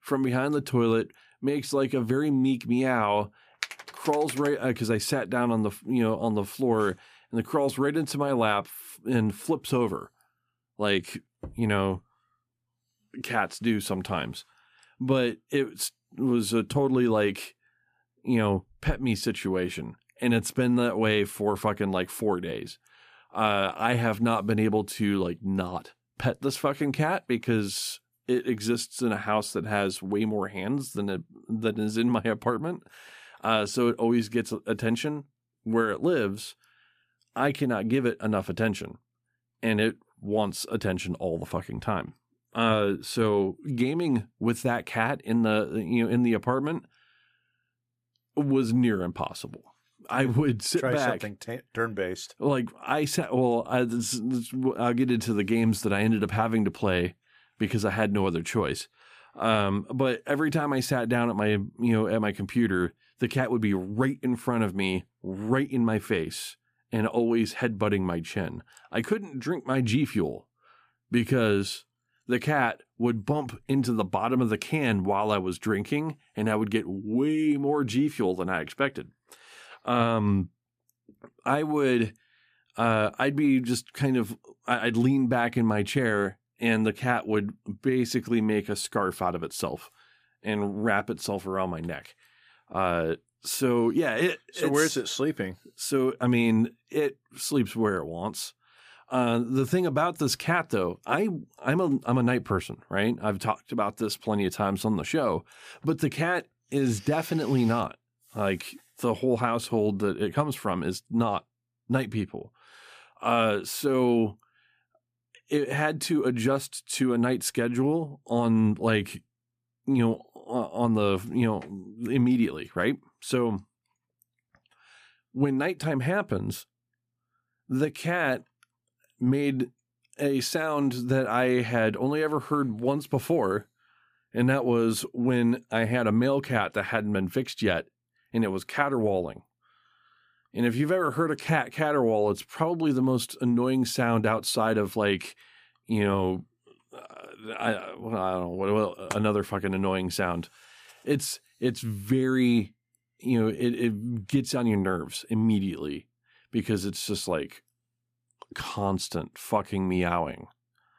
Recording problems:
none

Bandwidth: 14.5 kHz